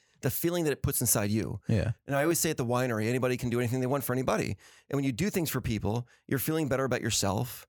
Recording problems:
none

